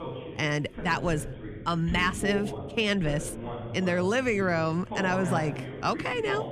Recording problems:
voice in the background; loud; throughout; 9 dB below the speech

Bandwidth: 14.5 kHz